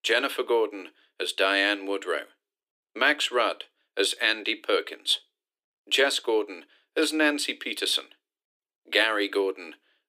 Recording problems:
thin; very; fading below 300 Hz

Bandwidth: 15 kHz